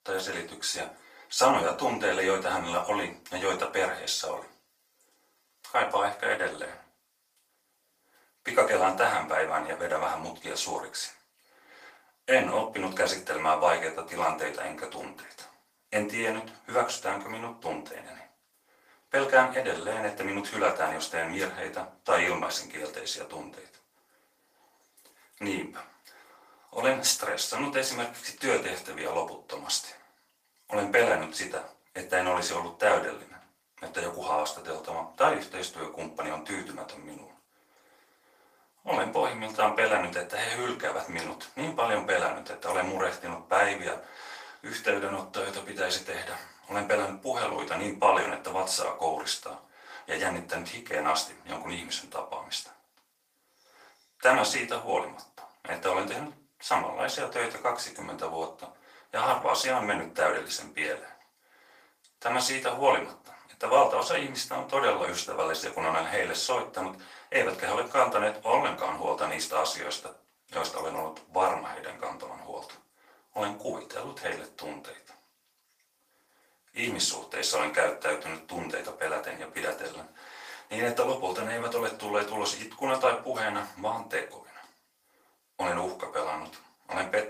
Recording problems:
off-mic speech; far
thin; very; fading below 800 Hz
room echo; slight; dies away in 0.3 s
garbled, watery; slightly; nothing above 15 kHz

